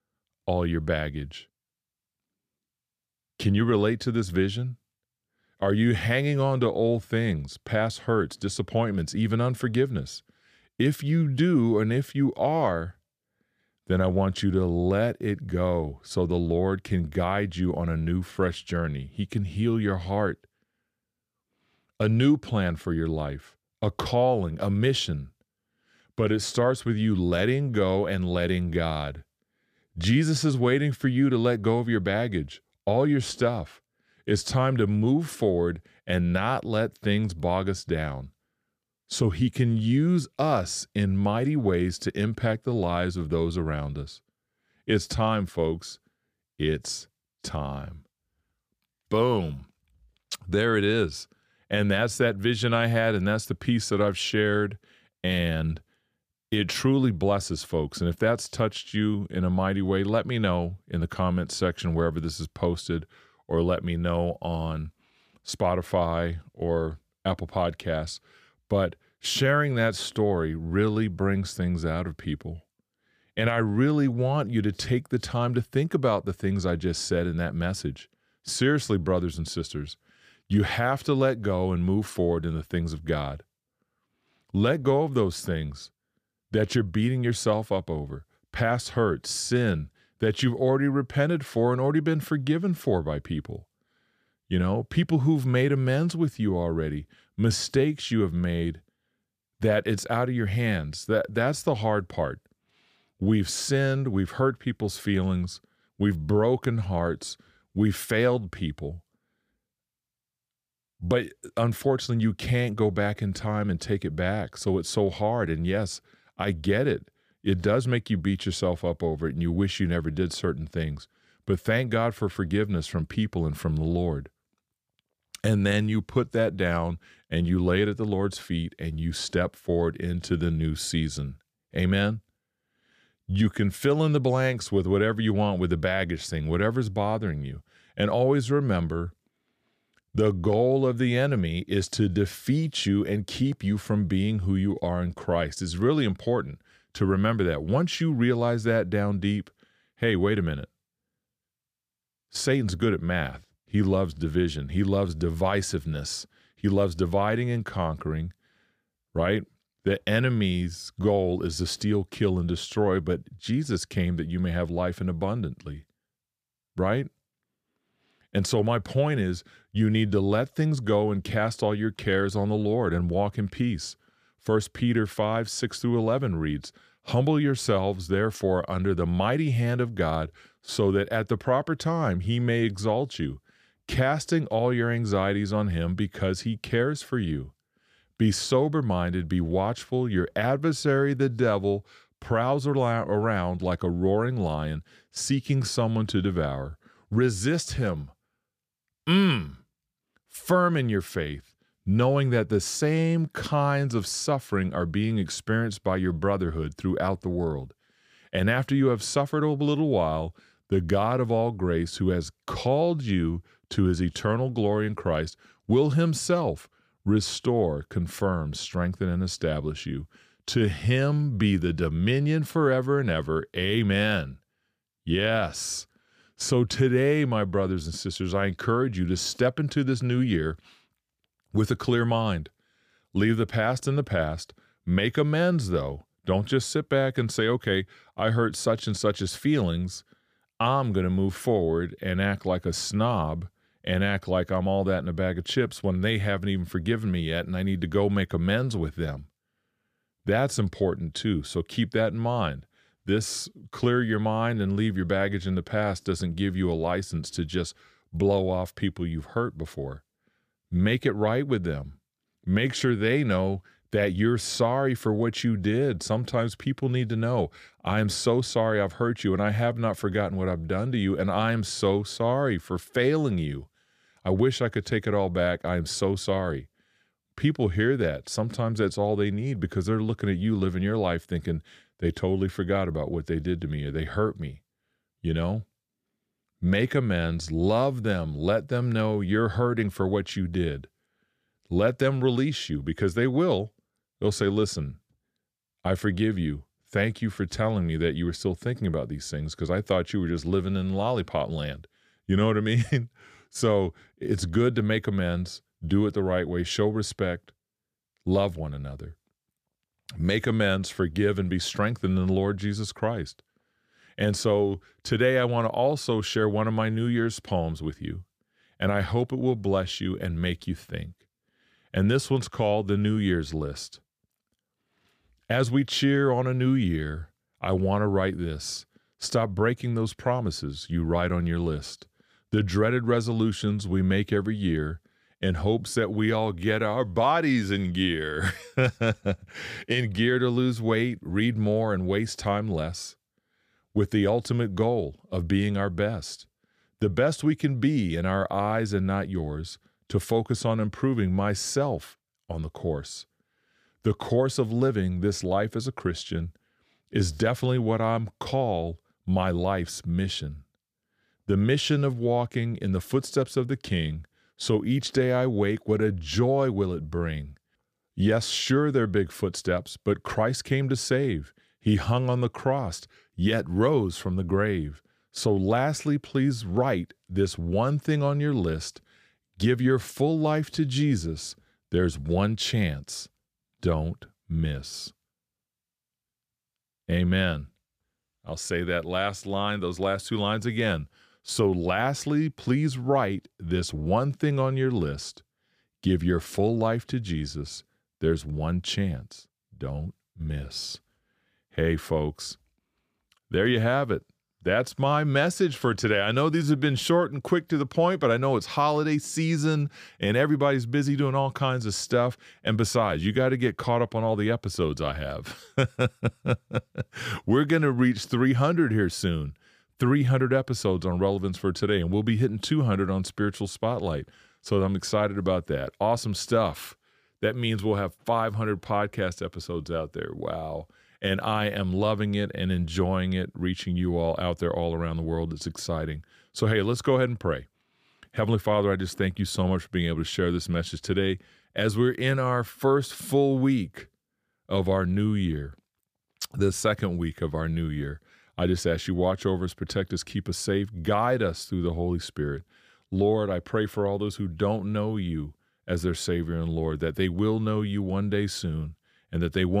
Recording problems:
abrupt cut into speech; at the end

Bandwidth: 15 kHz